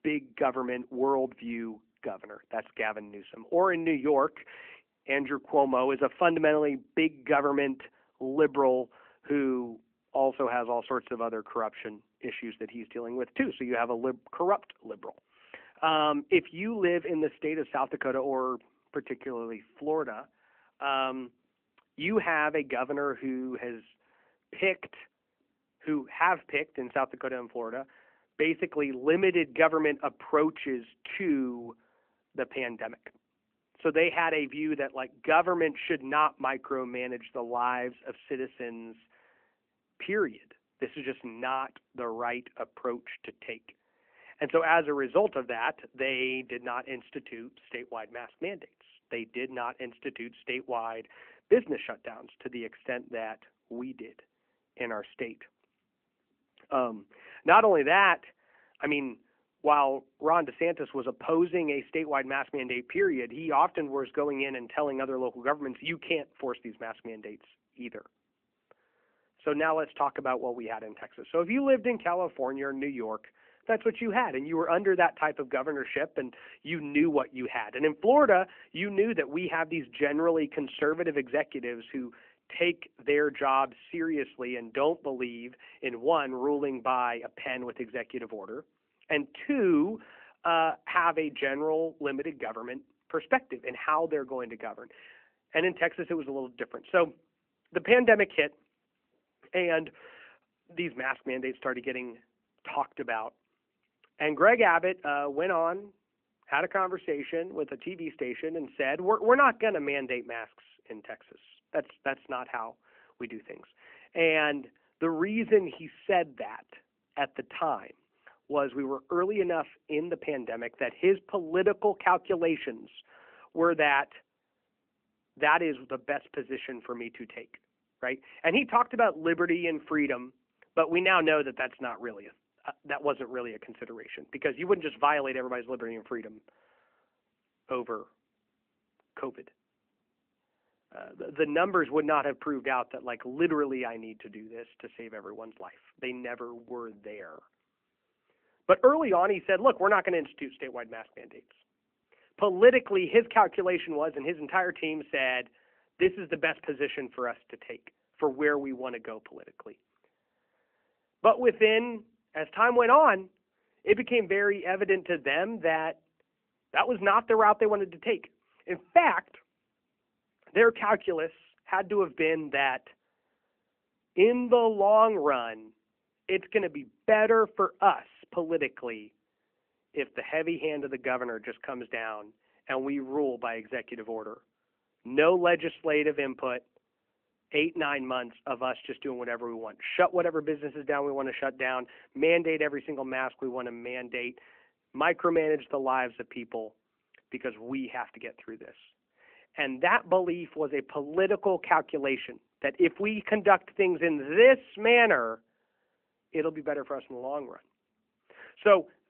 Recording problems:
phone-call audio; nothing above 3 kHz

